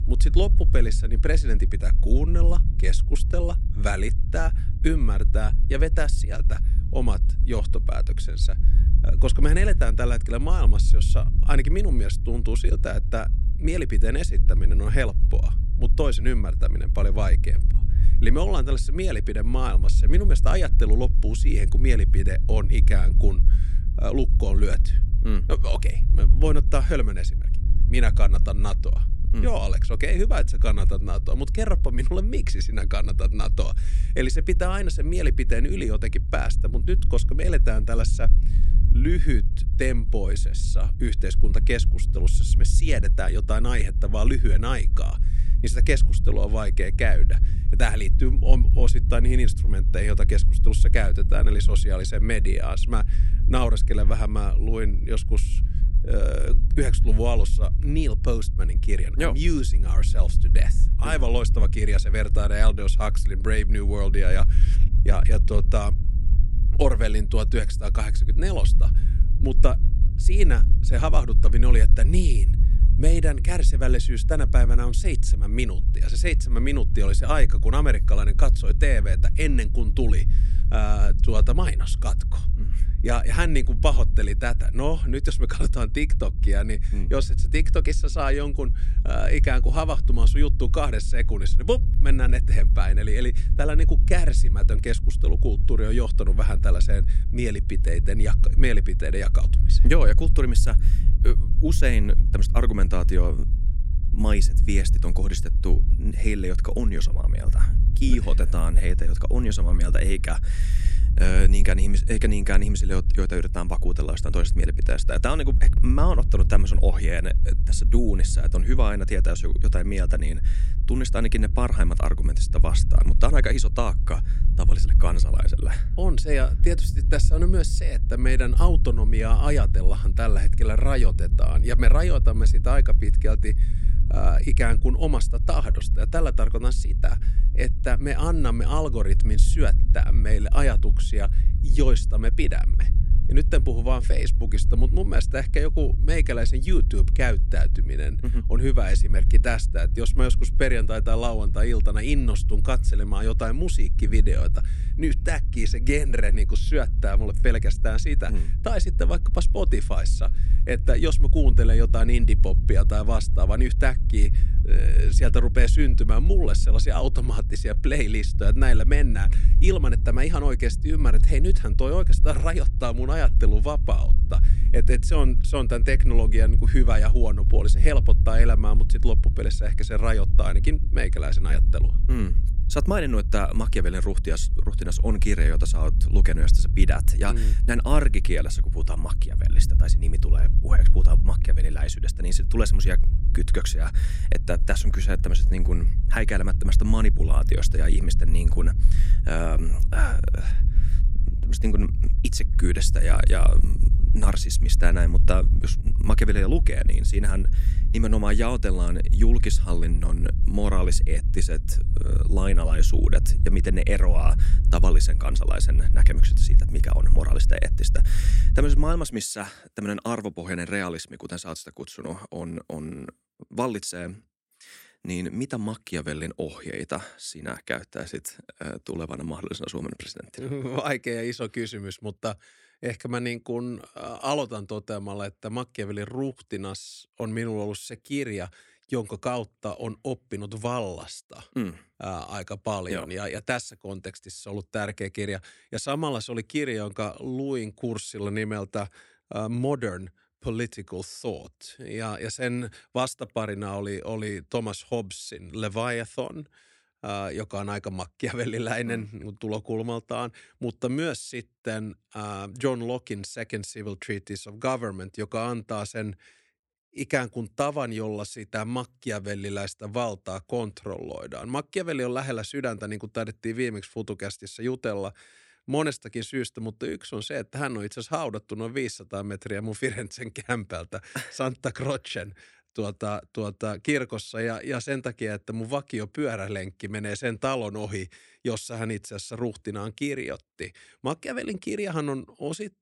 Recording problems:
low rumble; noticeable; until 3:39; 15 dB below the speech

